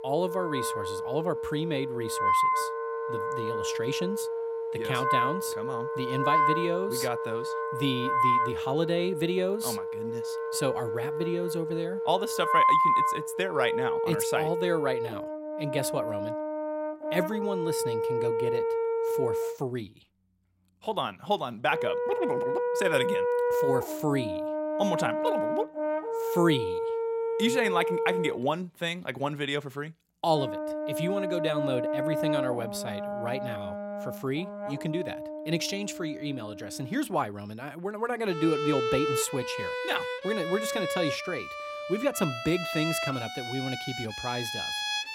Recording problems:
background music; very loud; throughout; 1 dB above the speech

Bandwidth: 16 kHz